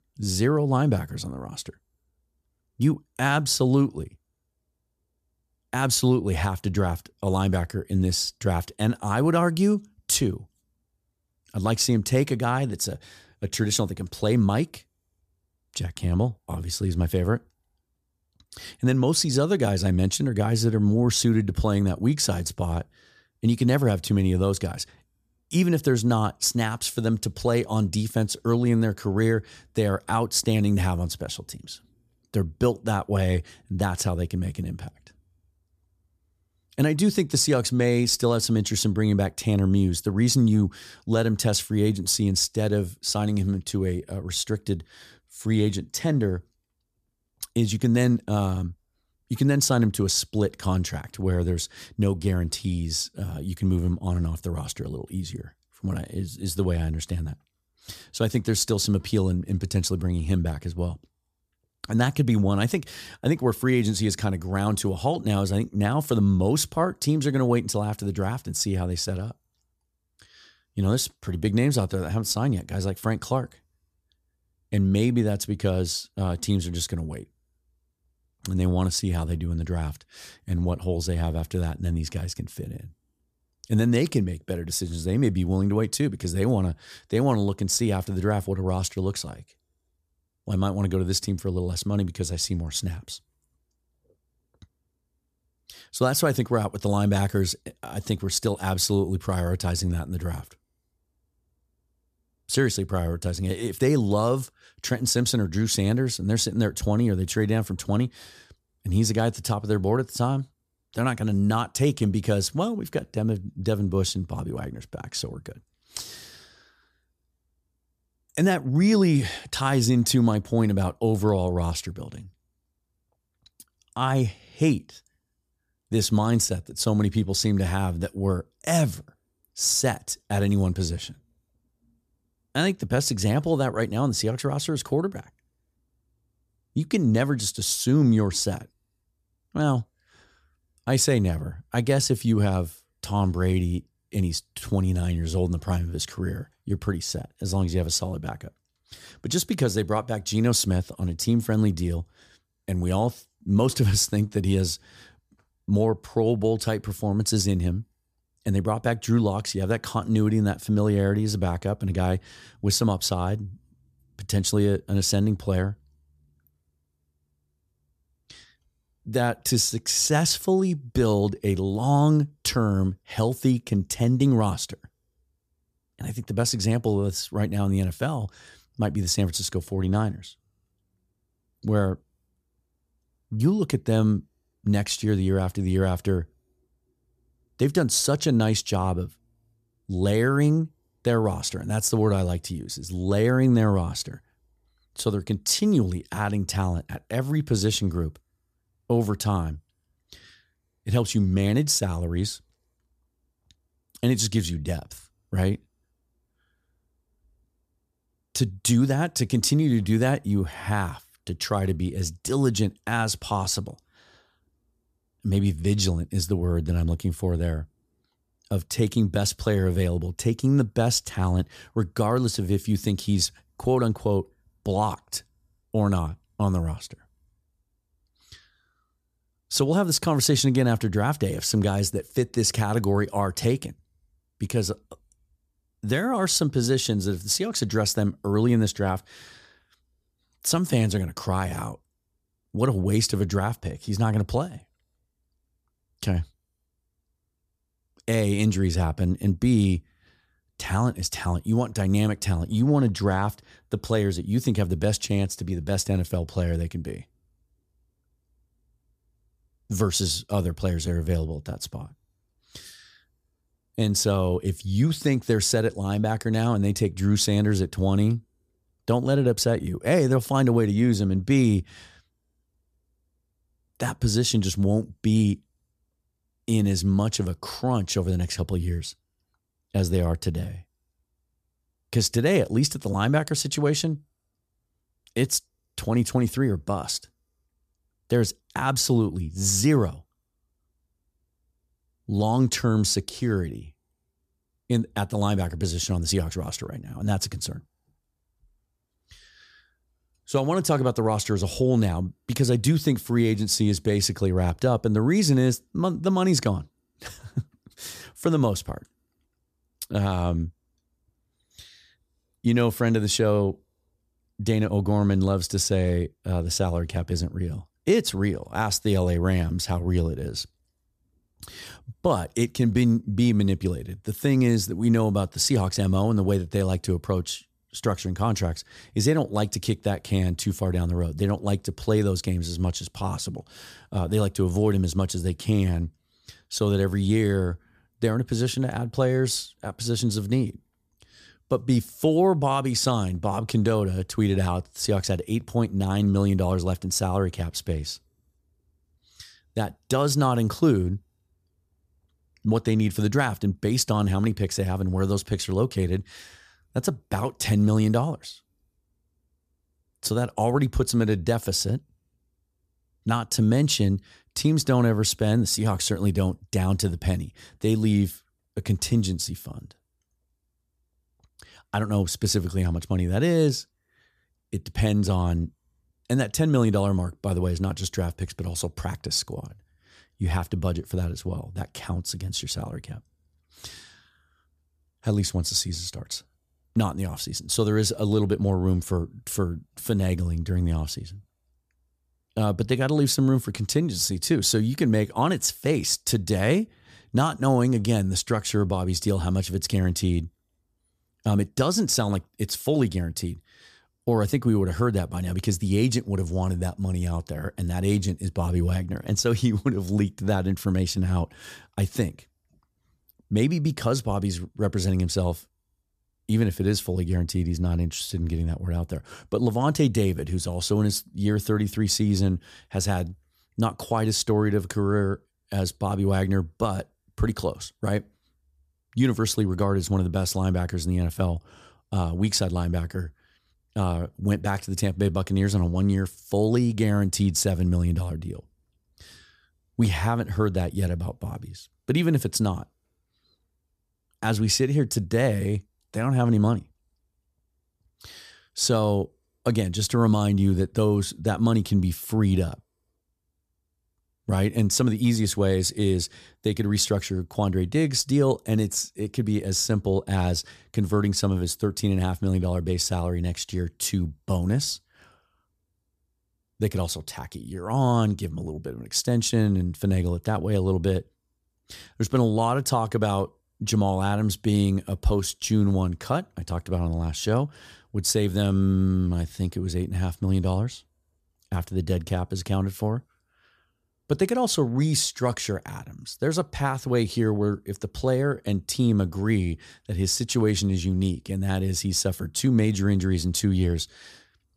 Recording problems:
none

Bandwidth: 14.5 kHz